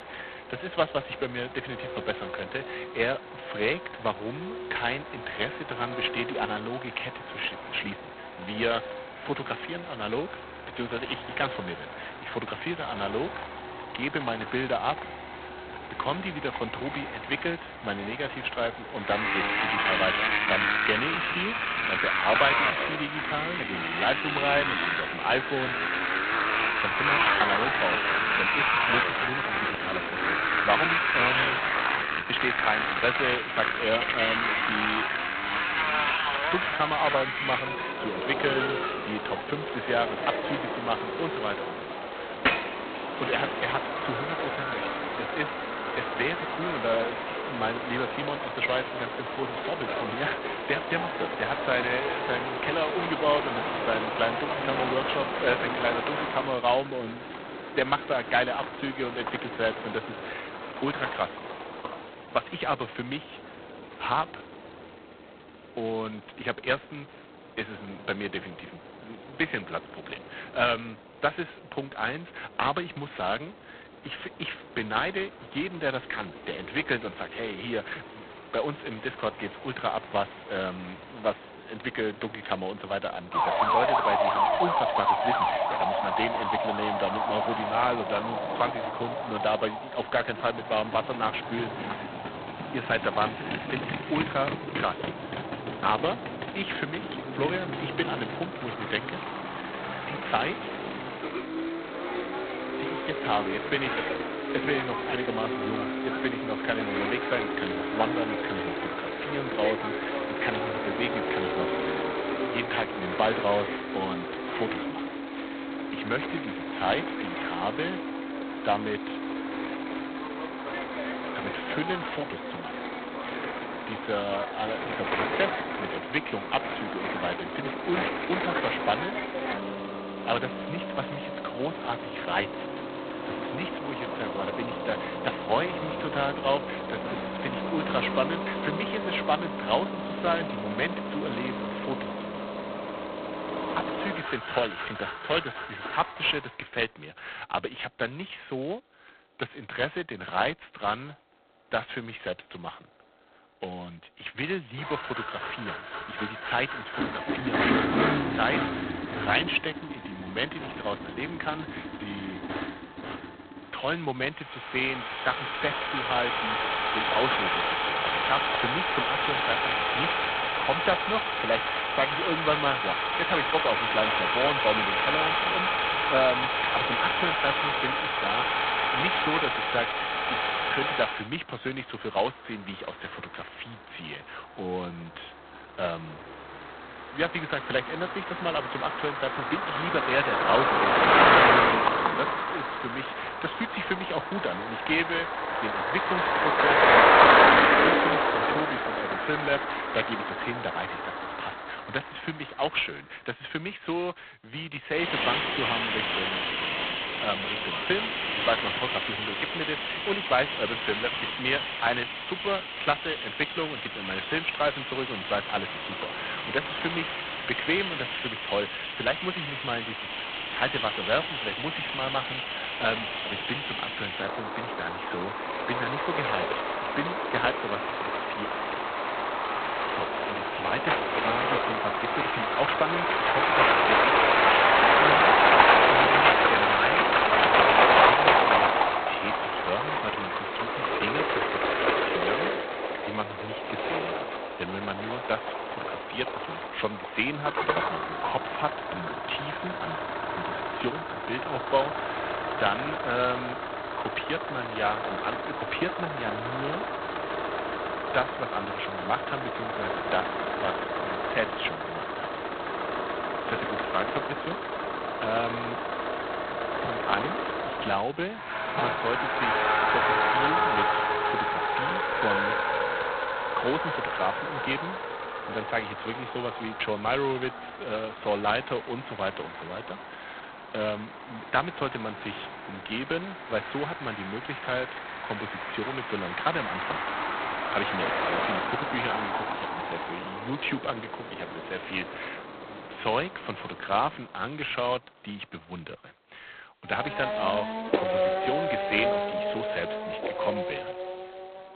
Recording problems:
phone-call audio; poor line; nothing above 4 kHz
traffic noise; very loud; throughout; 4 dB above the speech

